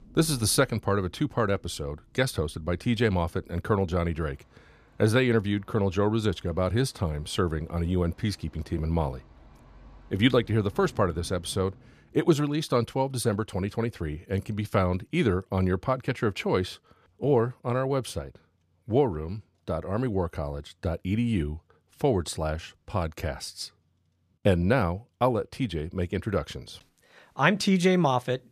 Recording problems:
rain or running water; faint; until 12 s; 25 dB below the speech

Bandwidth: 14.5 kHz